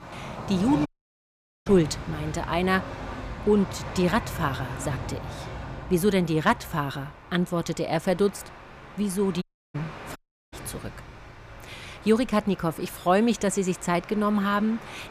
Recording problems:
train or aircraft noise; noticeable; throughout; 15 dB below the speech
audio cutting out; at 1 s for 1 s, at 9.5 s and at 10 s

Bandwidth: 15 kHz